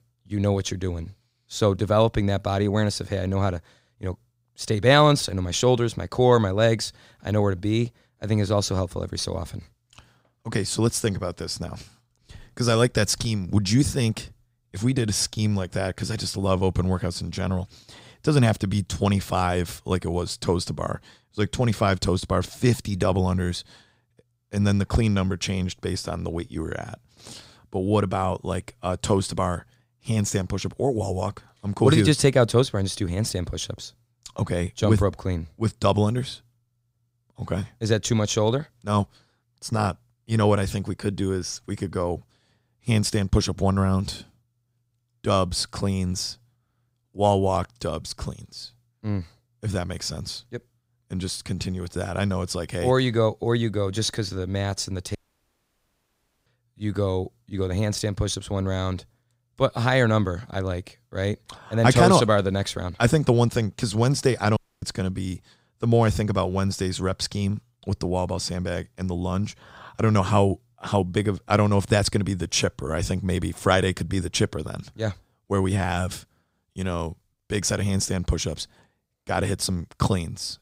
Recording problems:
audio cutting out; at 55 s for 1.5 s and at 1:05

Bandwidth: 15.5 kHz